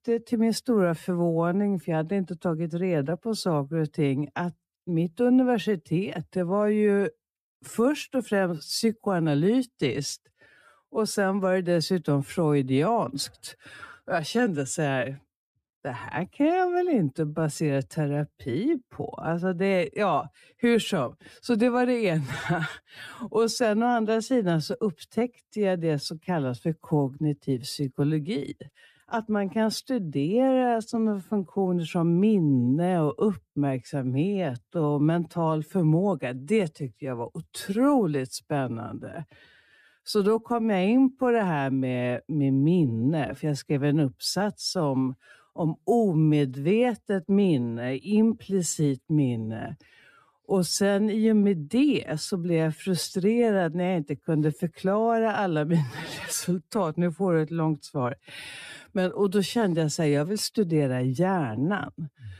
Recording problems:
wrong speed, natural pitch; too slow; 0.7 times normal speed

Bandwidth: 14.5 kHz